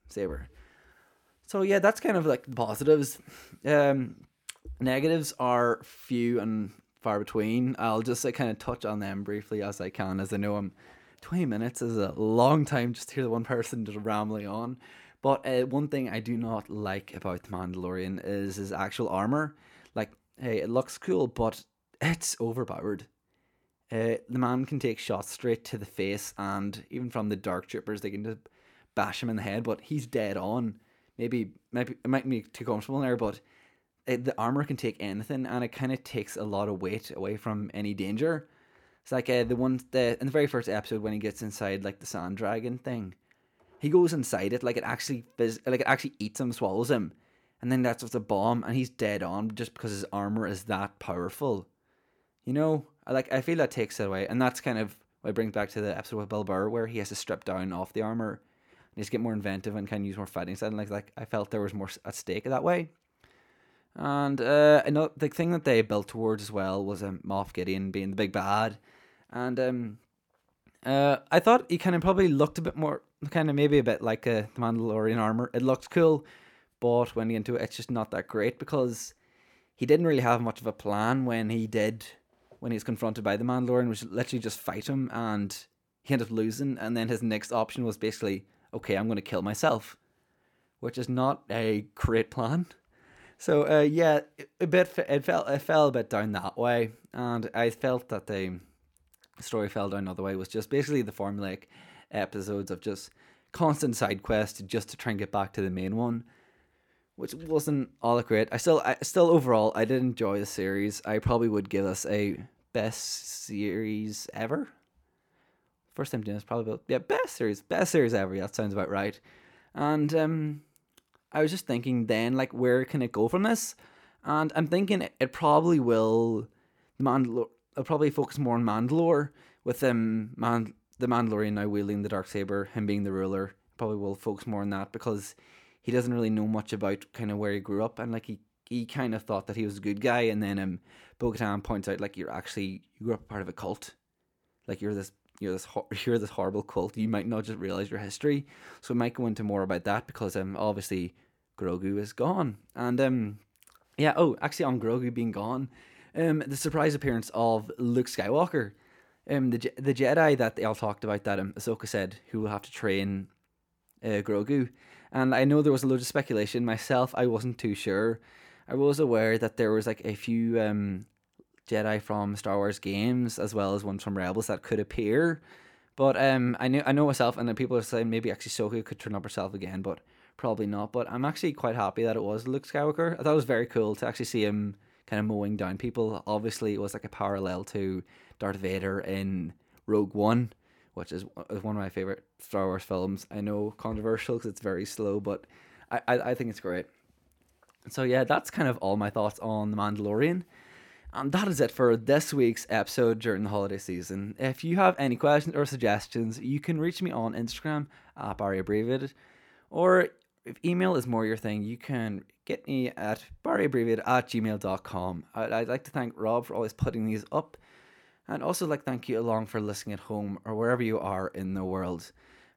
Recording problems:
none

